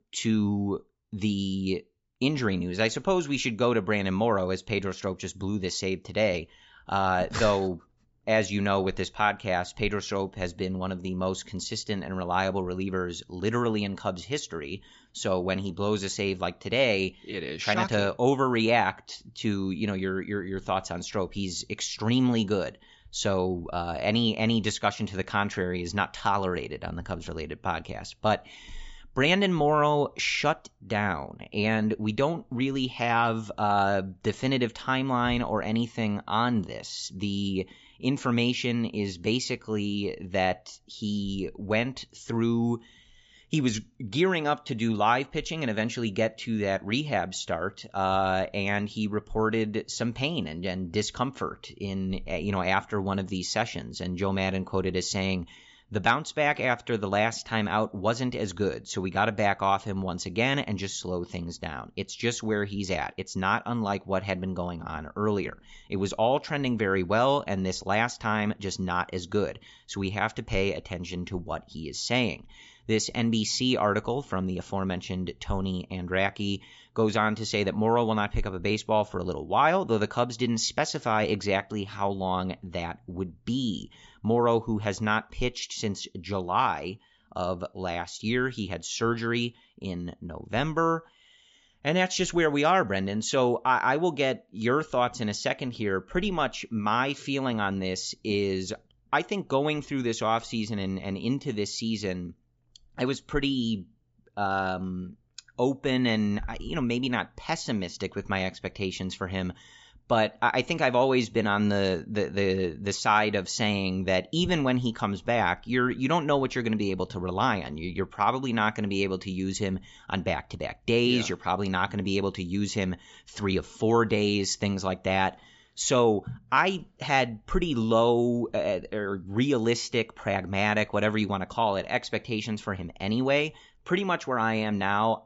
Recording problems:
high frequencies cut off; noticeable; nothing above 8 kHz

